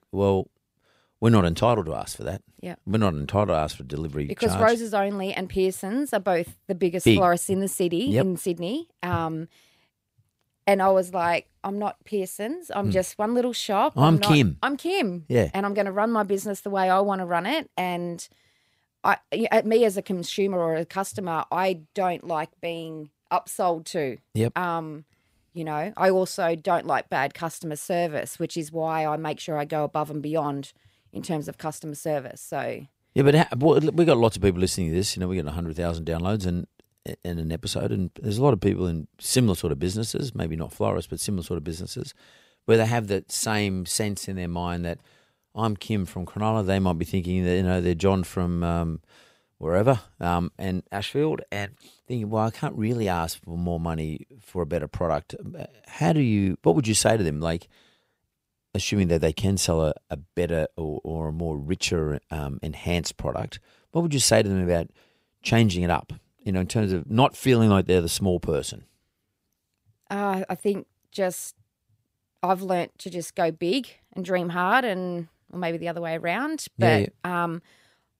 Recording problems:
none

